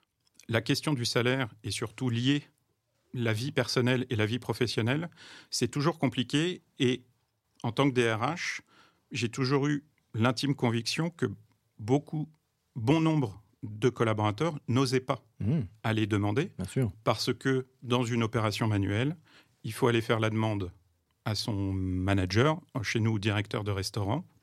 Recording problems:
none

